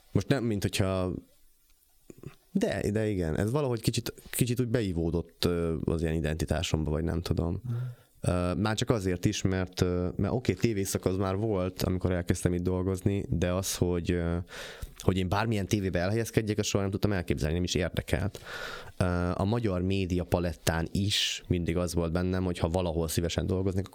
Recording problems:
squashed, flat; somewhat

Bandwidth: 17.5 kHz